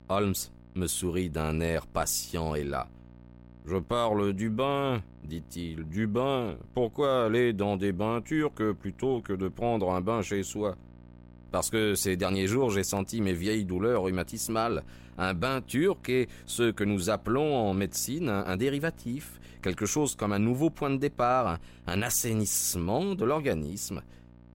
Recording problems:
electrical hum; faint; throughout; 60 Hz, 30 dB below the speech

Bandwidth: 16 kHz